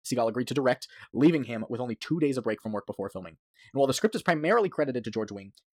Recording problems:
wrong speed, natural pitch; too fast; 1.5 times normal speed

